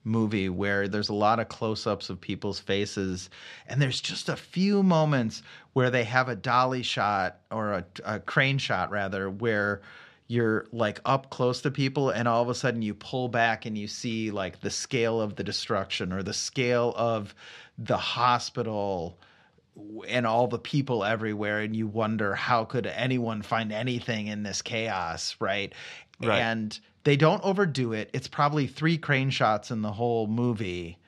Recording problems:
none

